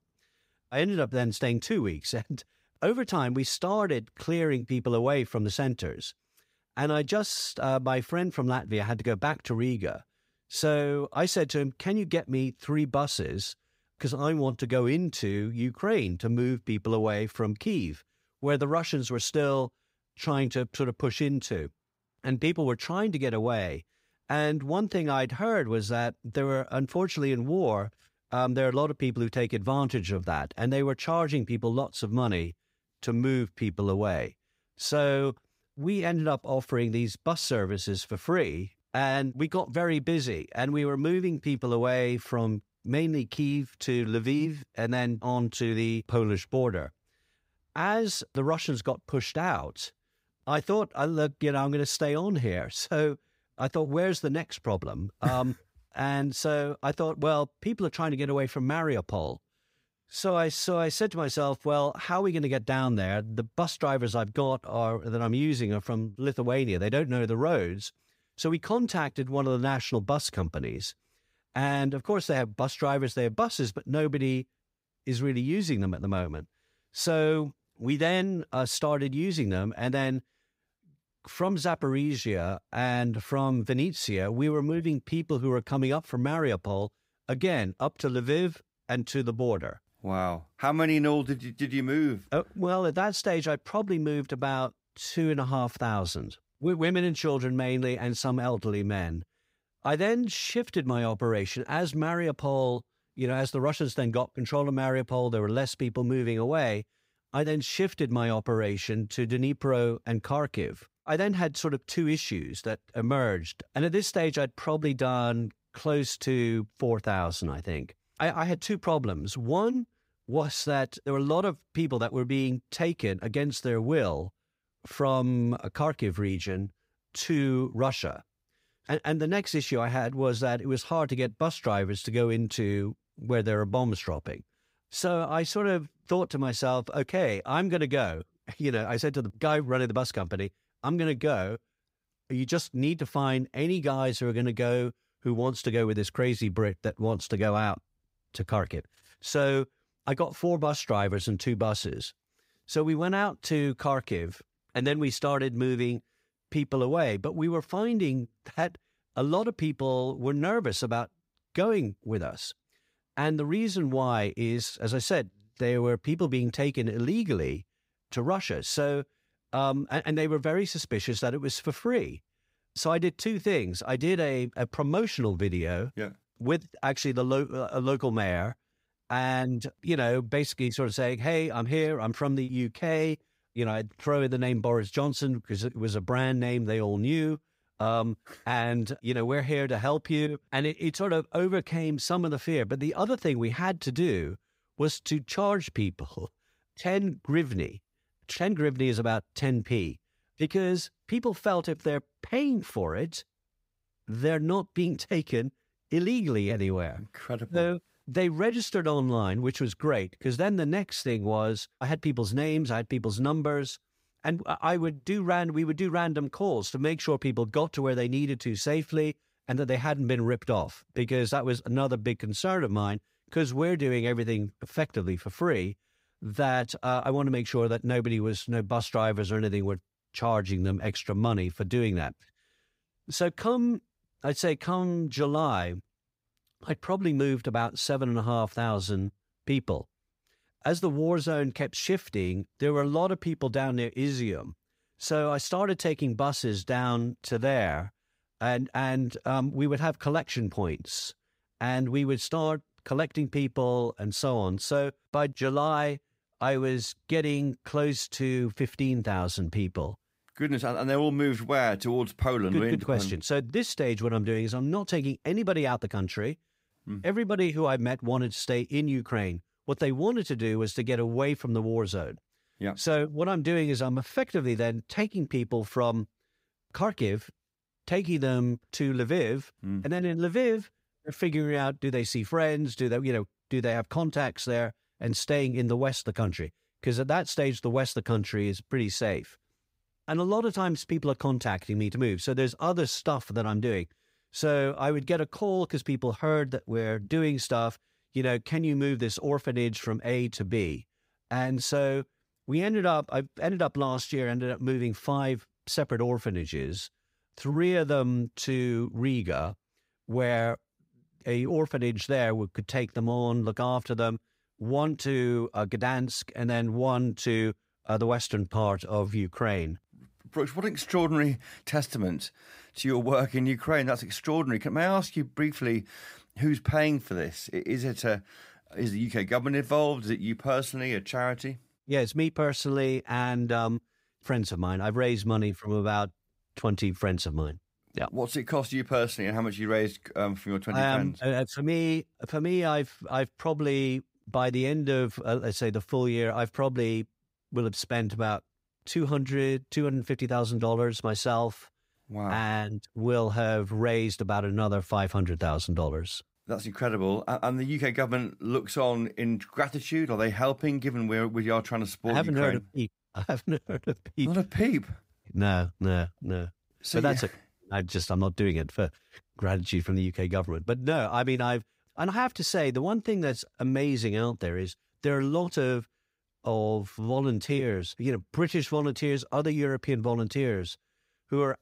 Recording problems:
none

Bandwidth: 15.5 kHz